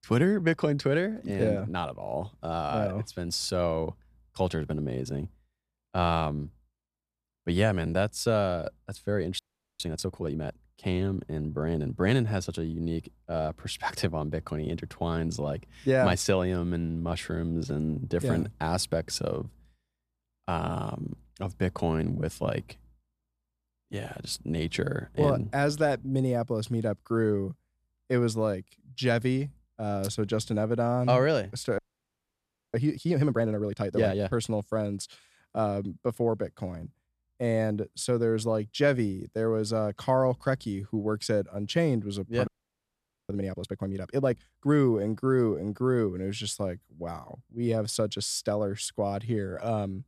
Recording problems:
audio freezing; at 9.5 s, at 32 s for 1 s and at 42 s for 1 s

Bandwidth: 13.5 kHz